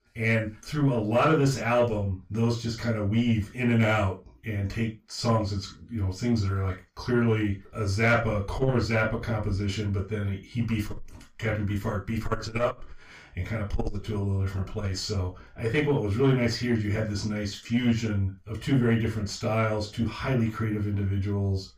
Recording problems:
off-mic speech; far
room echo; slight; dies away in 0.2 s
distortion; slight; 10 dB below the speech

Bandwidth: 15 kHz